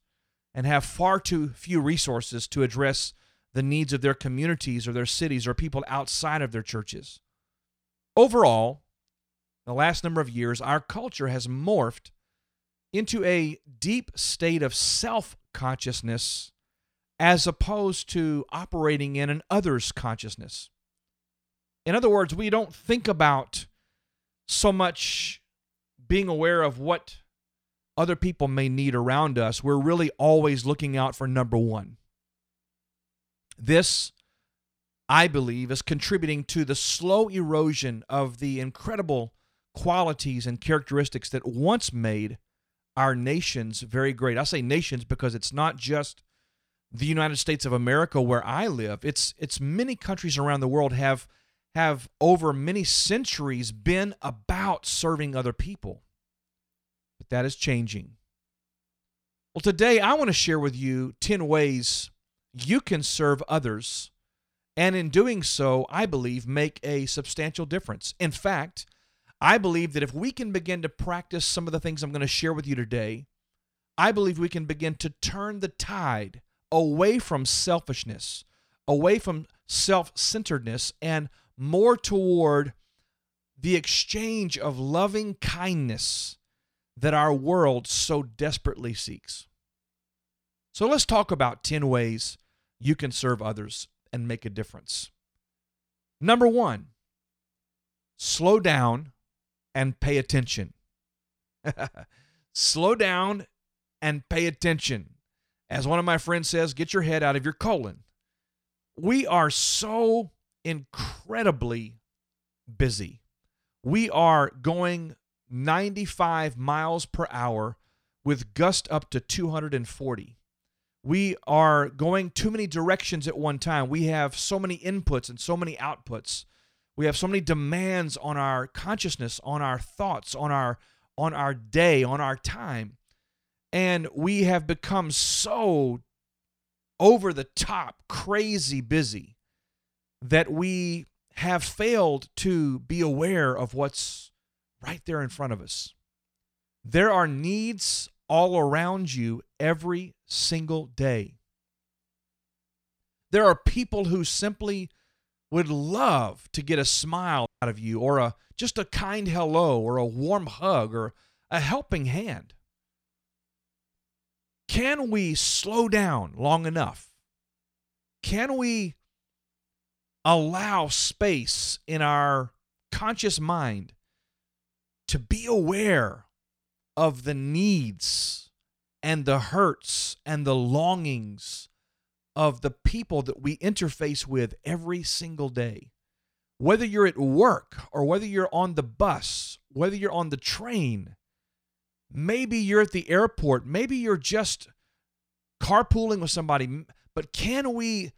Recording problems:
audio cutting out; at 2:37

